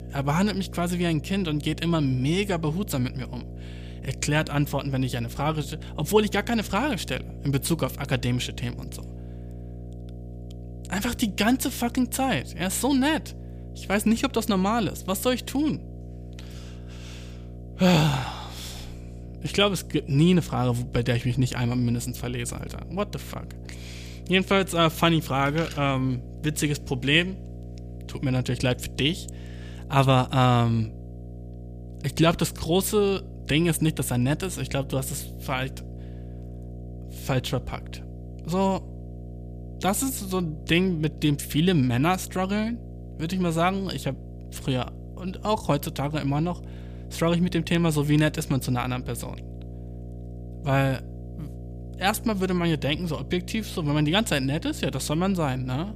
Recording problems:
electrical hum; faint; throughout; 60 Hz, 20 dB below the speech

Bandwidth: 15 kHz